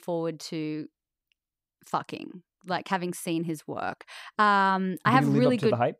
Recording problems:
none

